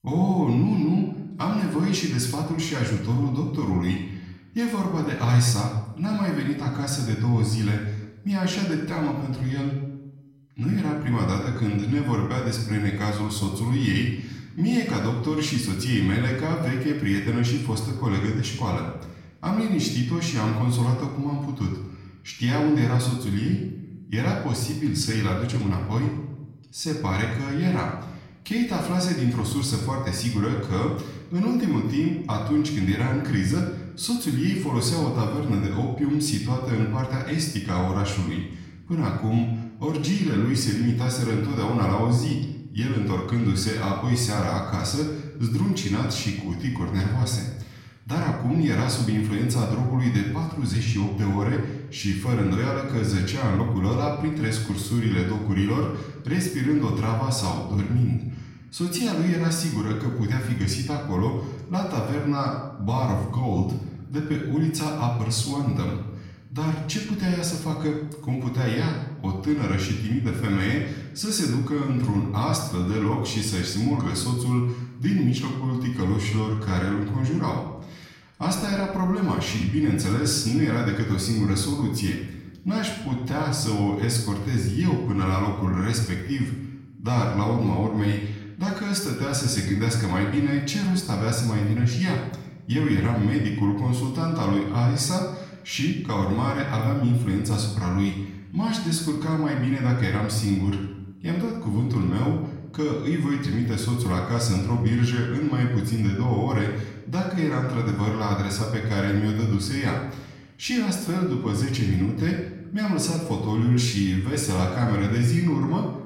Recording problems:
off-mic speech; far
room echo; noticeable; dies away in 0.8 s

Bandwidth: 16 kHz